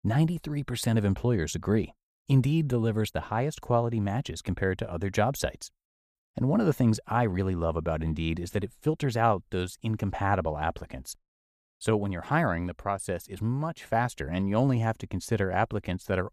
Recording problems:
none

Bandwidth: 14.5 kHz